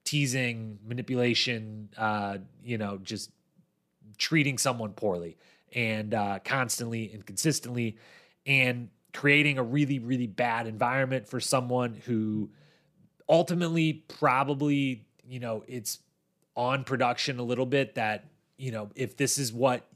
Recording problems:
none

